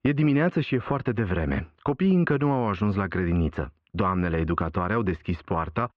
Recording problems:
muffled; very; fading above 2.5 kHz

